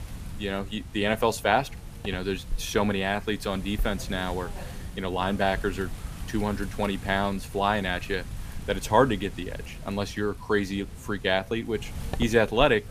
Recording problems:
wind noise on the microphone; occasional gusts; 20 dB below the speech
voice in the background; faint; throughout; 30 dB below the speech

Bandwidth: 15 kHz